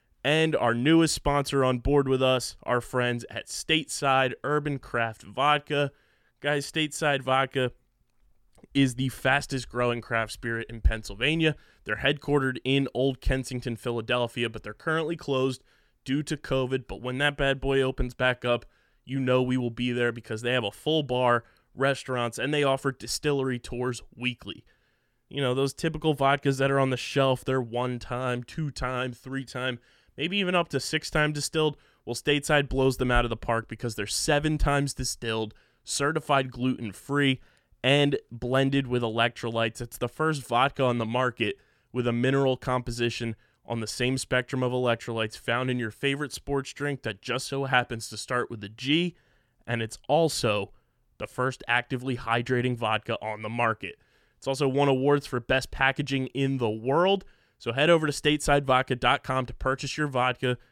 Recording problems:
none

